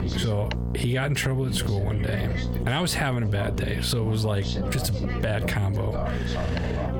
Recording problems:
squashed, flat; heavily, background pumping
background chatter; loud; throughout; 3 voices, 7 dB below the speech
electrical hum; noticeable; throughout; 60 Hz, 10 dB below the speech

